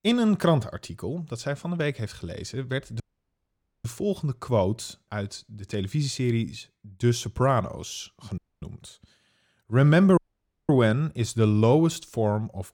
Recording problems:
audio cutting out; at 3 s for 1 s, at 8.5 s and at 10 s for 0.5 s

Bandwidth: 17.5 kHz